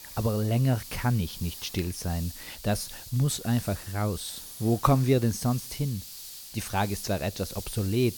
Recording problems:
hiss; noticeable; throughout; 10 dB below the speech

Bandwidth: 18 kHz